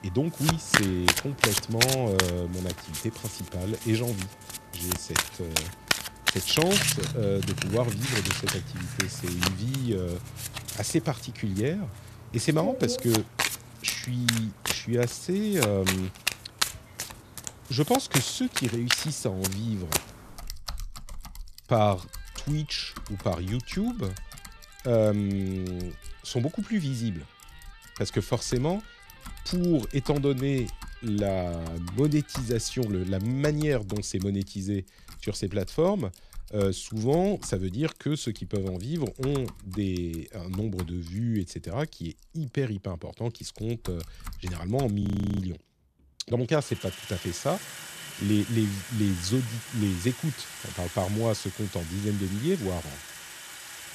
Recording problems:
household noises; loud; throughout; 2 dB below the speech
background music; noticeable; until 34 s; 15 dB below the speech
audio freezing; at 45 s

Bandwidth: 14 kHz